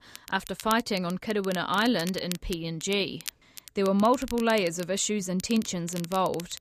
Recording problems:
crackle, like an old record; noticeable; 15 dB below the speech

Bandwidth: 14.5 kHz